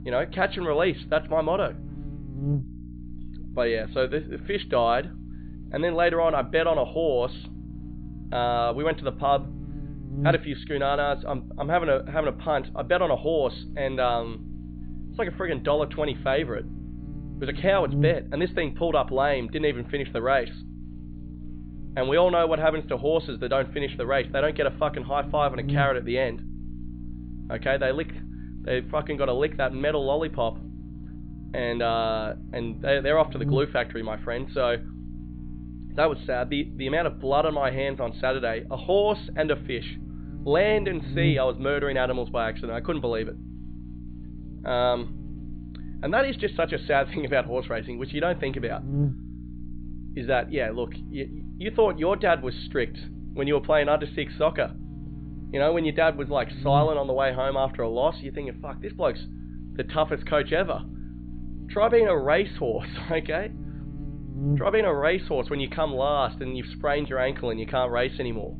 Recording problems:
high frequencies cut off; severe; nothing above 4.5 kHz
electrical hum; noticeable; throughout; 60 Hz, 20 dB below the speech

